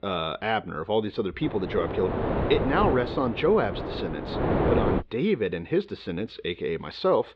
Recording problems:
muffled; slightly; fading above 4 kHz
wind noise on the microphone; heavy; from 1.5 to 5 s; 3 dB below the speech

